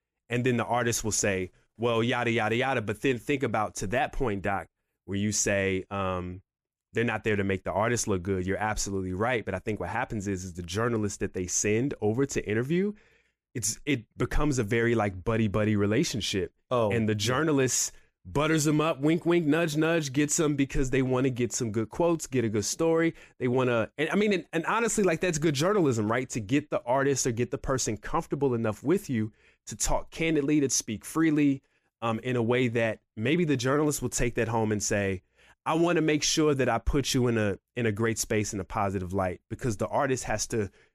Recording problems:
none

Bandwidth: 15 kHz